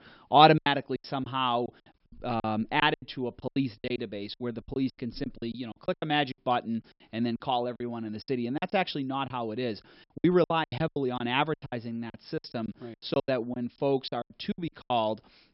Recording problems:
high frequencies cut off; noticeable; nothing above 5.5 kHz
choppy; very; 17% of the speech affected

